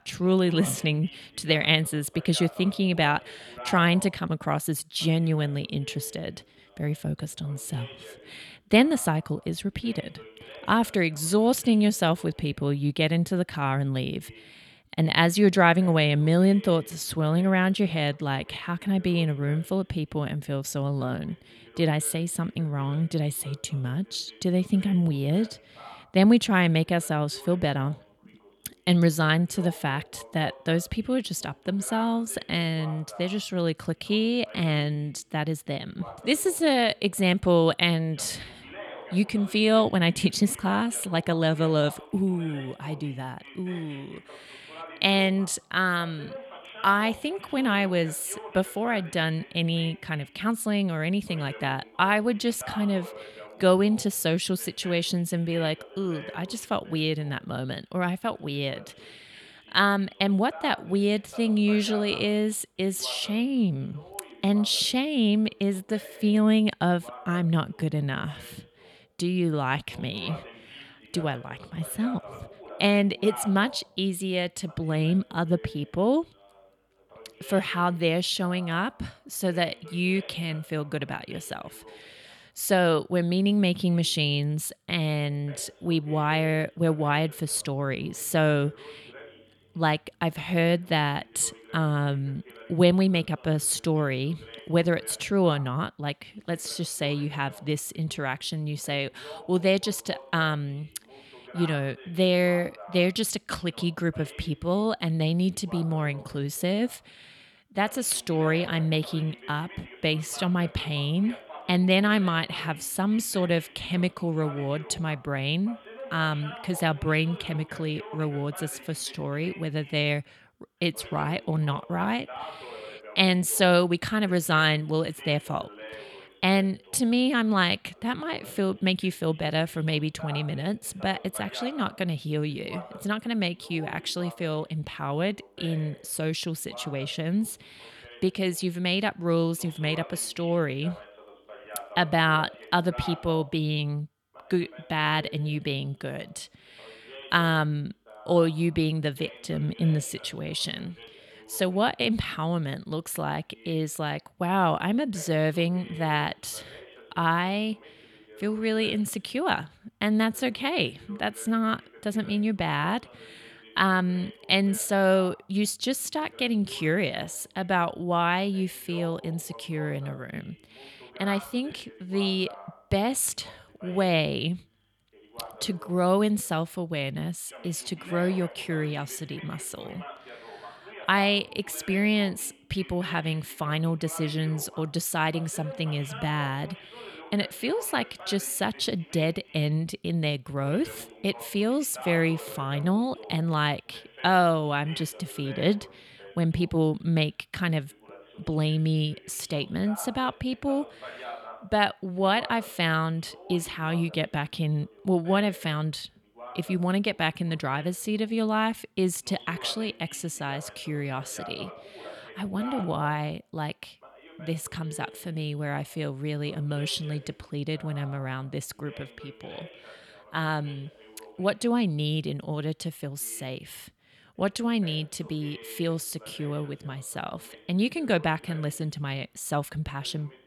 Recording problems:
voice in the background; noticeable; throughout; 20 dB below the speech

